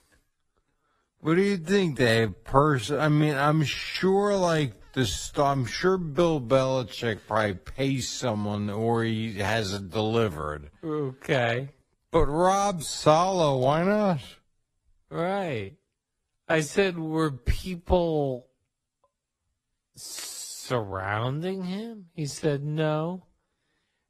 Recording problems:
wrong speed, natural pitch; too slow; 0.5 times normal speed
garbled, watery; slightly; nothing above 14.5 kHz

